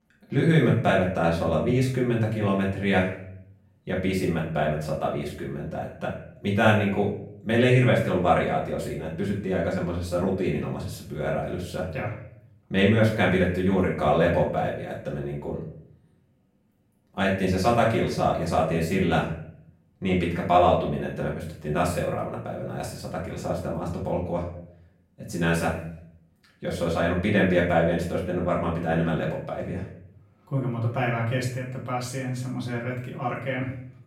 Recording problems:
off-mic speech; far
room echo; noticeable; dies away in 0.5 s

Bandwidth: 16 kHz